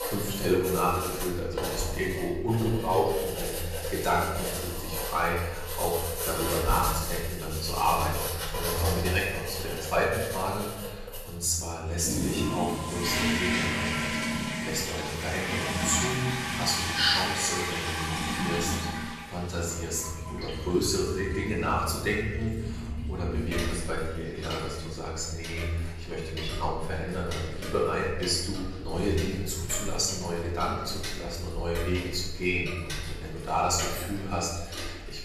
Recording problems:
off-mic speech; far
room echo; noticeable; dies away in 1.2 s
household noises; loud; throughout; 4 dB below the speech

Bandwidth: 13.5 kHz